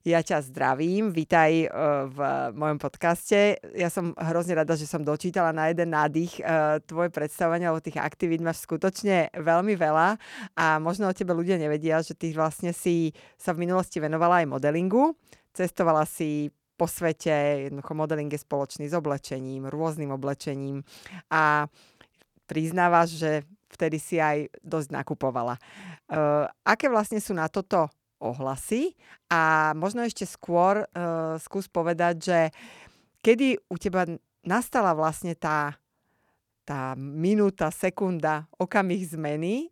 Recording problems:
none

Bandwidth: 19 kHz